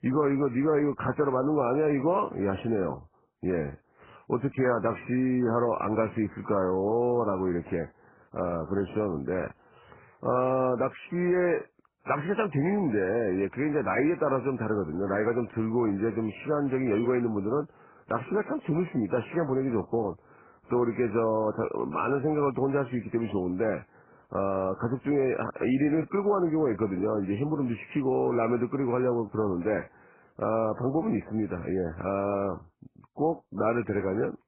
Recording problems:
garbled, watery; badly

